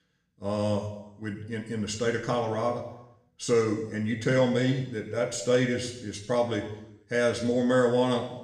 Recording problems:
room echo; slight; dies away in 0.8 s
off-mic speech; somewhat distant

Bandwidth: 15.5 kHz